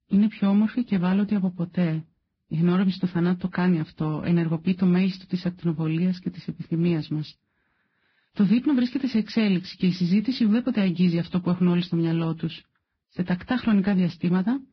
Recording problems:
garbled, watery; badly; nothing above 5.5 kHz
muffled; very slightly; fading above 4 kHz

